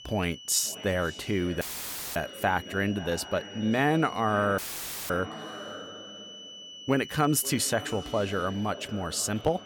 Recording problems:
echo of what is said; noticeable; throughout; 530 ms later, 15 dB below the speech
high-pitched whine; noticeable; throughout; 3 kHz, 15 dB below the speech
audio cutting out; filled with static; at 1.5 s for 0.5 s and at 4.5 s for 0.5 s

